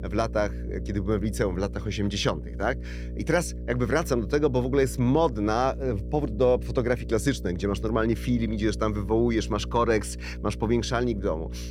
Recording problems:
electrical hum; noticeable; throughout; 60 Hz, 20 dB below the speech

